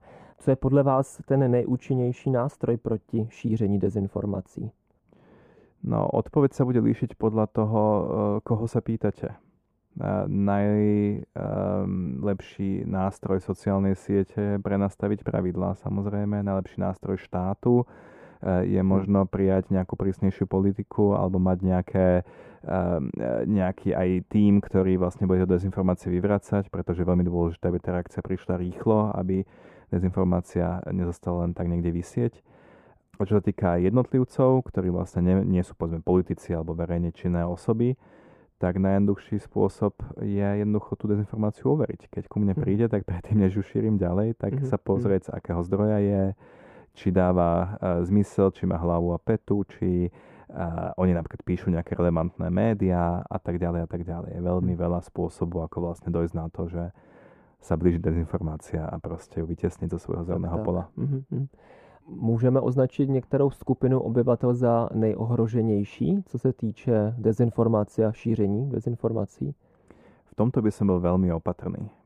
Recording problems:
muffled; very; fading above 2 kHz

